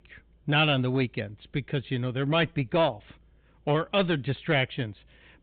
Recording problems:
high frequencies cut off; severe; nothing above 4 kHz
distortion; slight; 5% of the sound clipped

